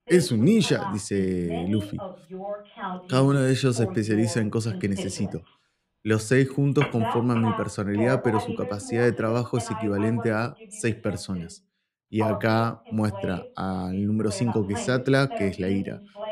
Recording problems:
voice in the background; noticeable; throughout; 10 dB below the speech

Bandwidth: 15.5 kHz